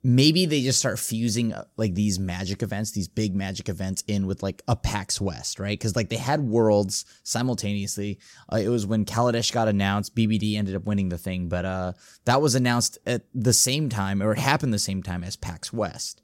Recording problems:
none

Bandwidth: 16.5 kHz